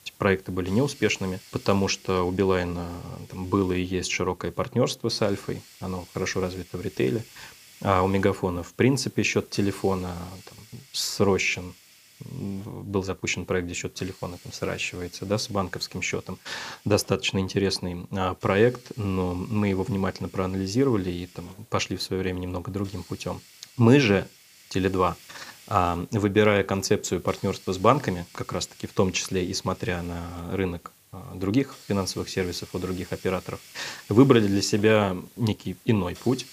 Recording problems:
hiss; faint; throughout; 25 dB below the speech

